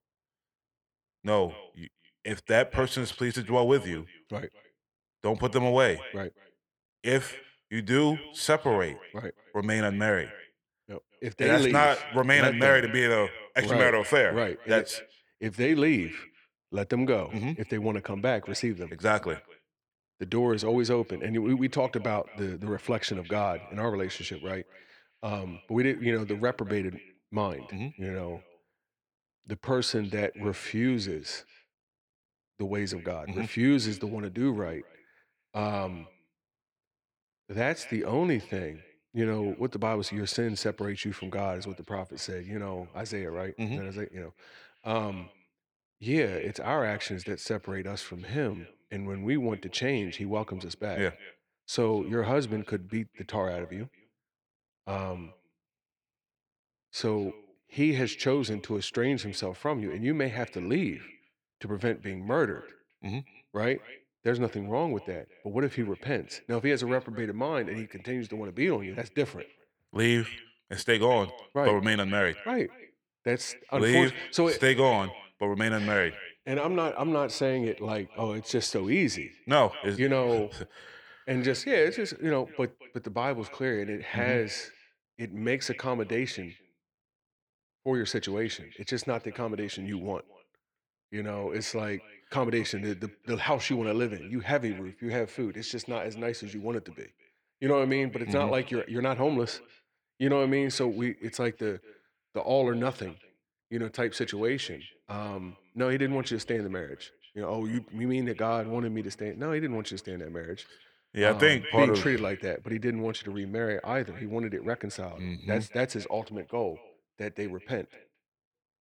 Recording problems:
echo of what is said; faint; throughout; 220 ms later, 20 dB below the speech

